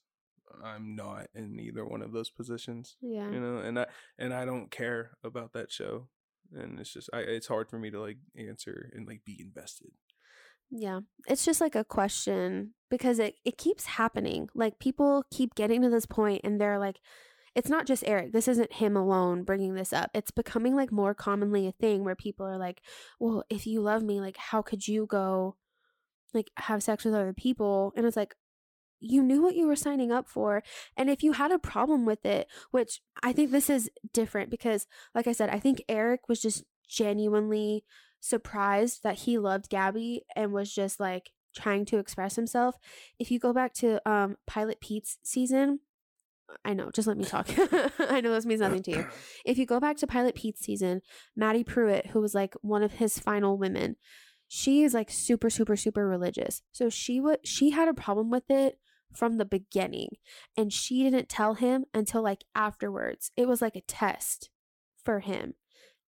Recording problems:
none

